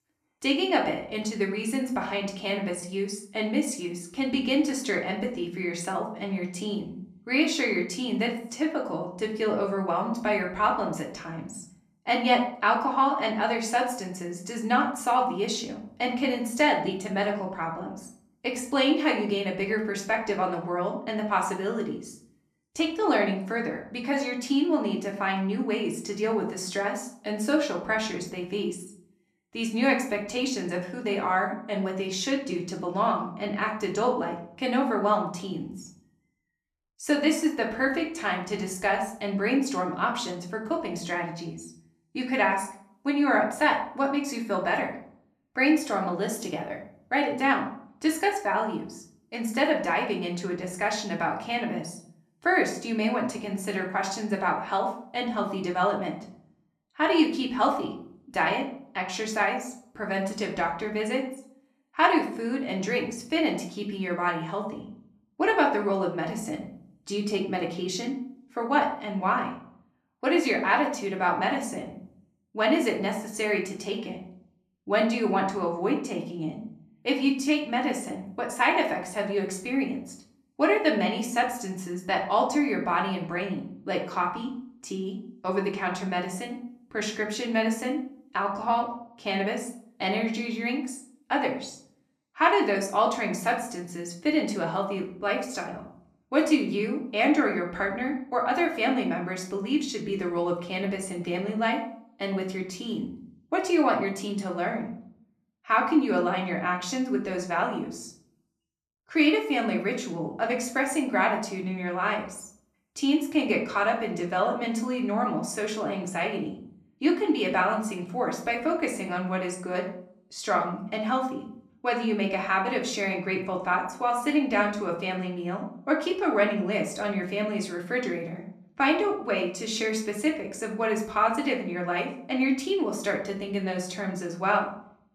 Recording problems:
room echo; slight; dies away in 0.5 s
off-mic speech; somewhat distant

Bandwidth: 14.5 kHz